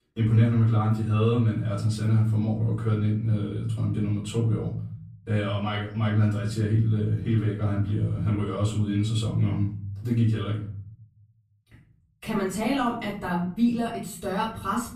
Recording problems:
off-mic speech; far
room echo; noticeable; dies away in 1 s

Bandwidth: 14.5 kHz